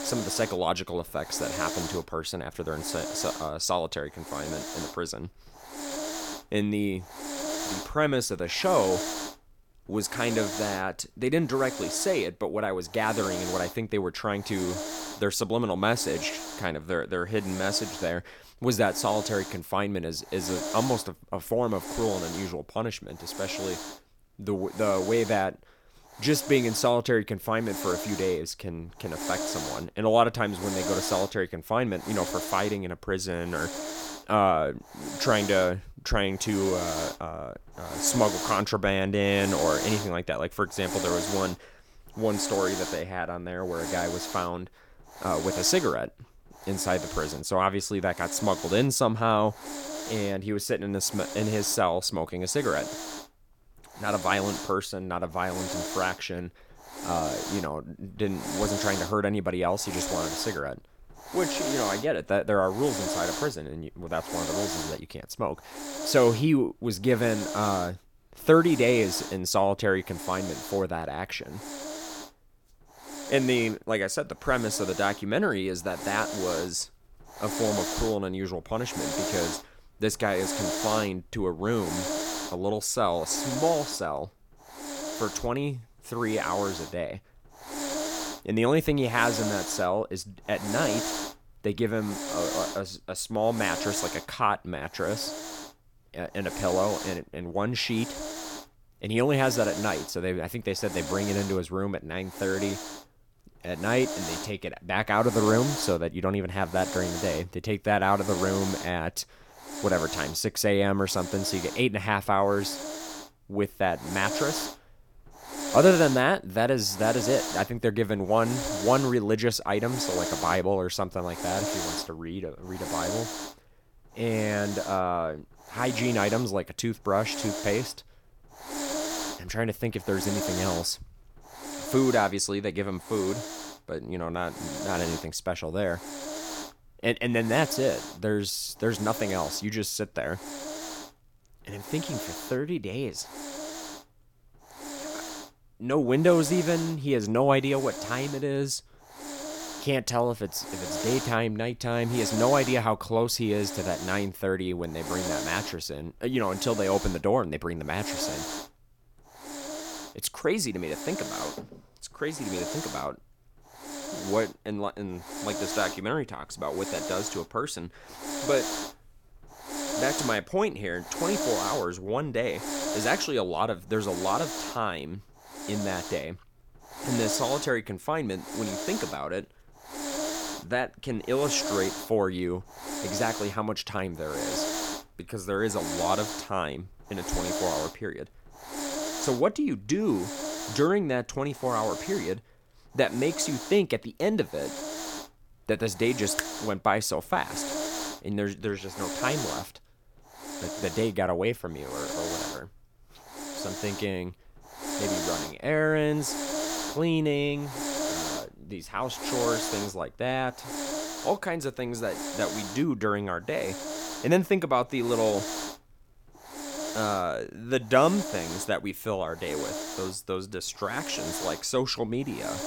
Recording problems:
hiss; loud; throughout; 6 dB below the speech

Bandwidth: 17 kHz